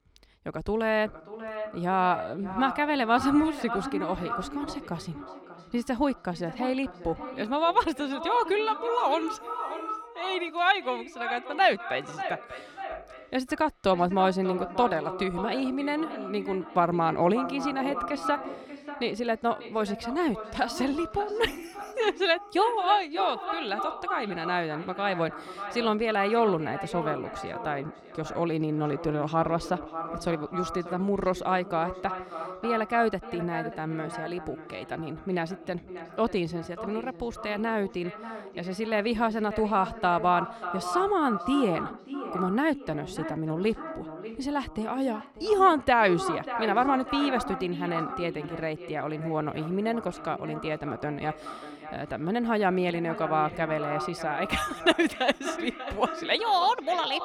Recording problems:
echo of what is said; strong; throughout; 590 ms later, 9 dB below the speech

